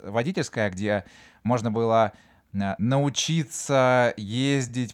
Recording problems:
uneven, jittery; strongly

